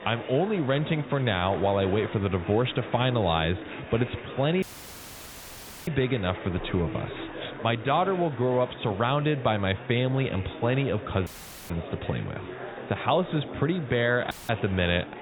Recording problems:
high frequencies cut off; severe; nothing above 4 kHz
murmuring crowd; noticeable; throughout; 10 dB below the speech
audio cutting out; filled with static; at 4.5 s for 1.5 s, at 11 s and at 14 s

